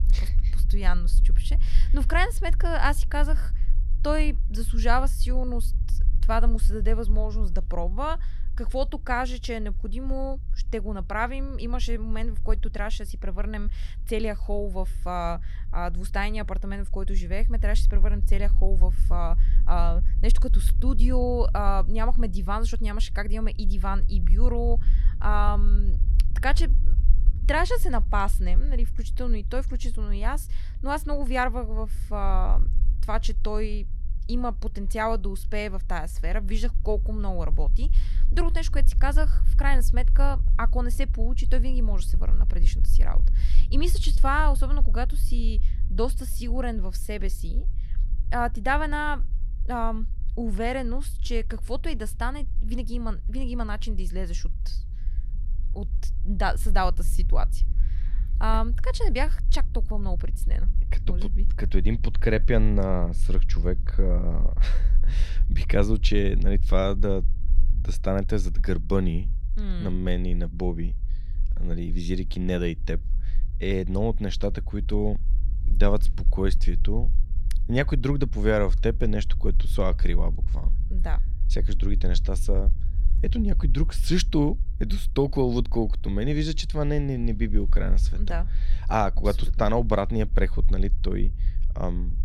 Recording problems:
low rumble; faint; throughout; 20 dB below the speech

